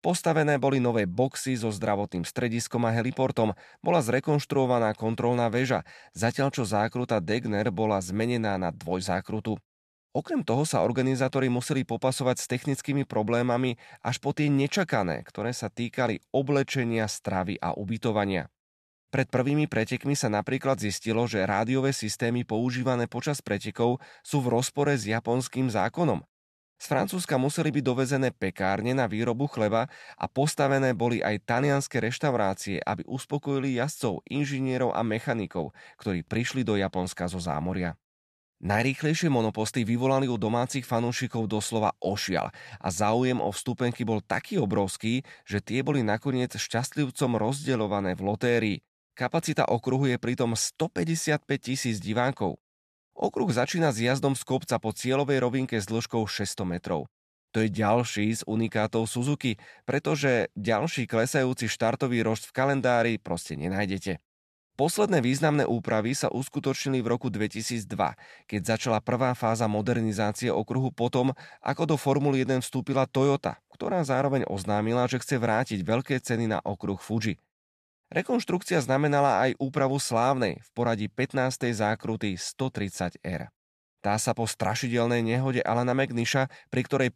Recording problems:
none

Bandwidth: 13.5 kHz